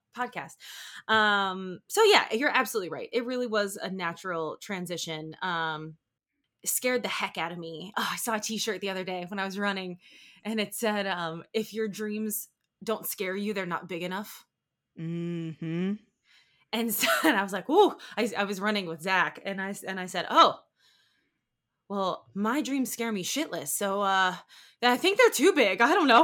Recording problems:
abrupt cut into speech; at the end

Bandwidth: 17 kHz